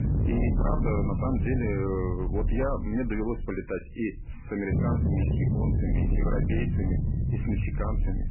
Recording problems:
garbled, watery; badly; nothing above 3 kHz
distortion; slight; 16% of the sound clipped
low rumble; loud; throughout; 5 dB below the speech

